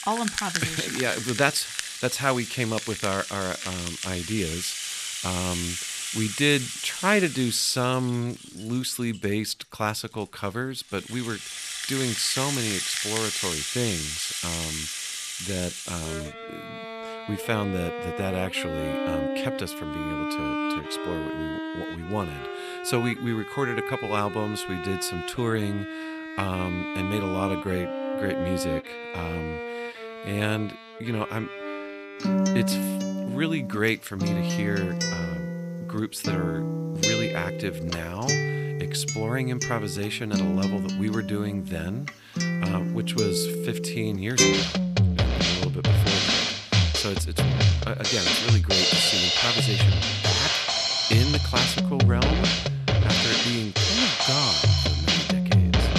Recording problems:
background music; very loud; throughout; 4 dB above the speech

